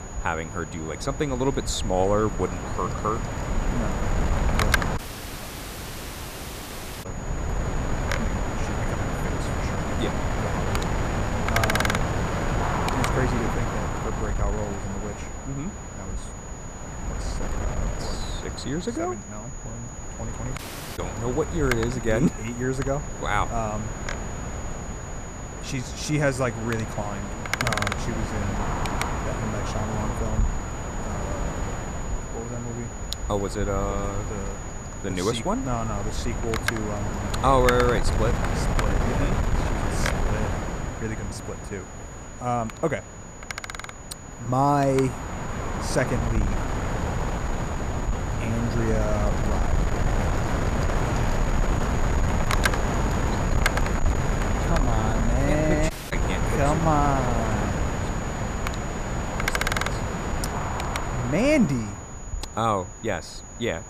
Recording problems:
wind noise on the microphone; heavy; 2 dB below the speech
high-pitched whine; noticeable; throughout; 7 kHz, 15 dB below the speech
audio cutting out; at 5 s for 2 s, at 21 s and at 56 s

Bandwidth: 14.5 kHz